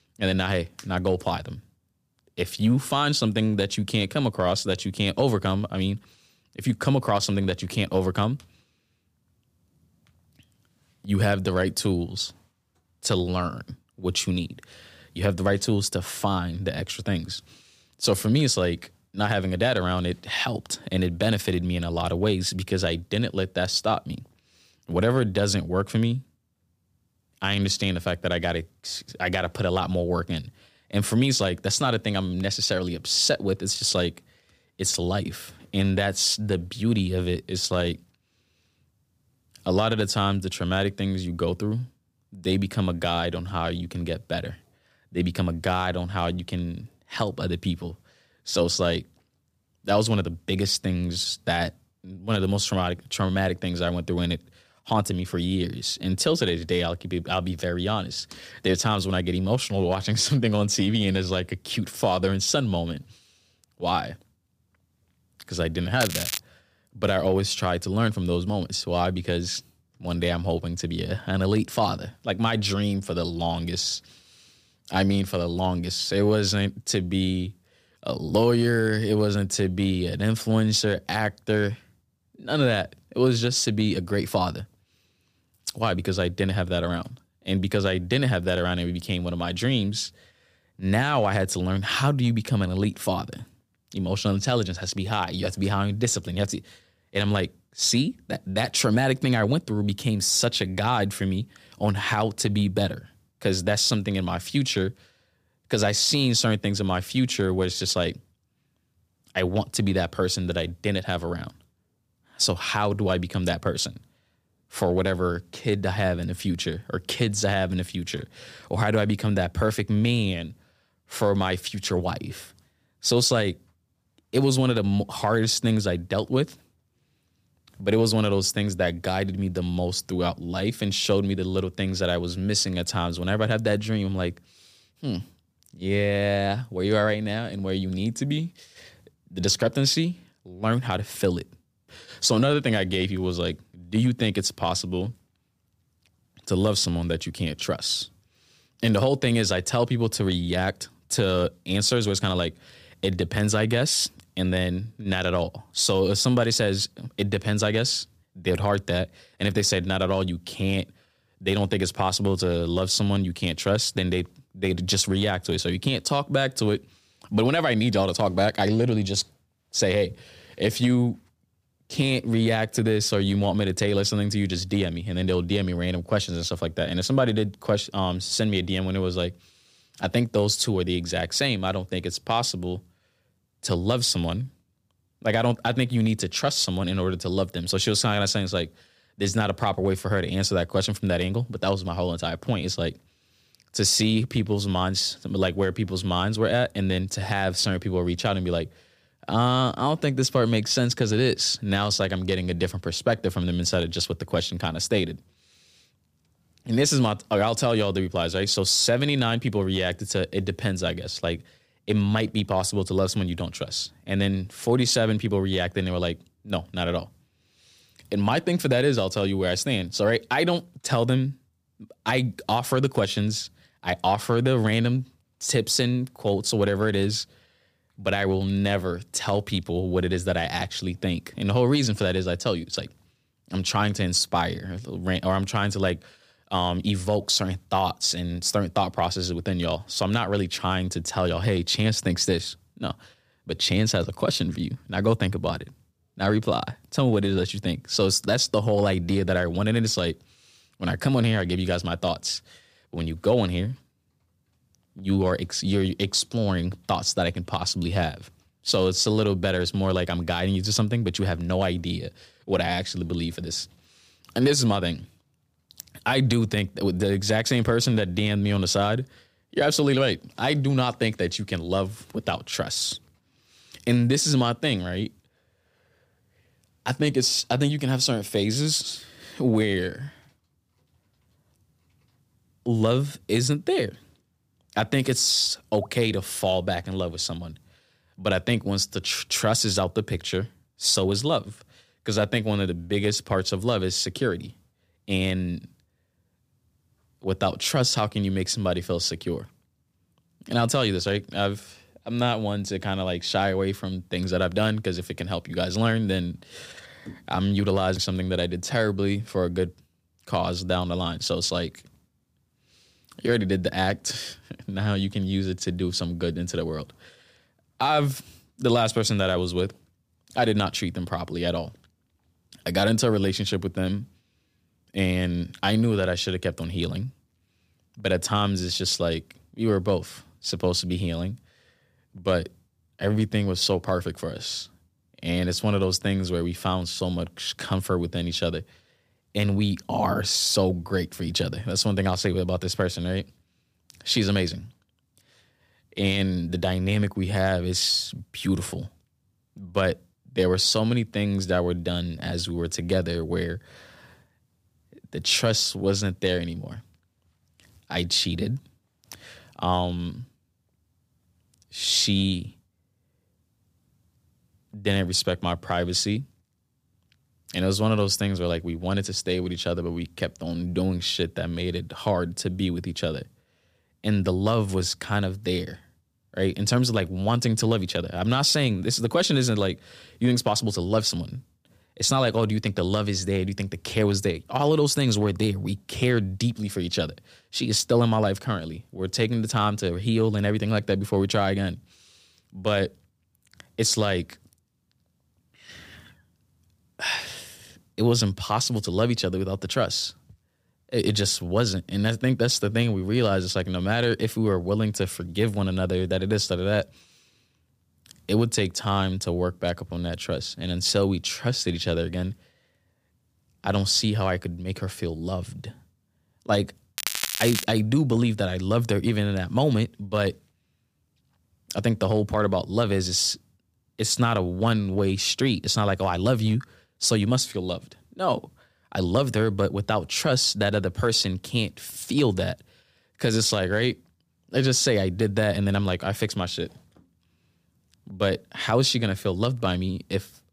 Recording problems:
crackling; loud; at 1:06 and at 6:57; 4 dB below the speech

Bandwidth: 15 kHz